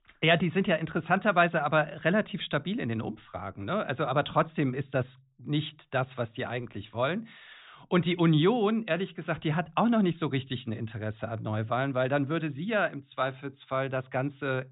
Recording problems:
high frequencies cut off; severe; nothing above 4 kHz

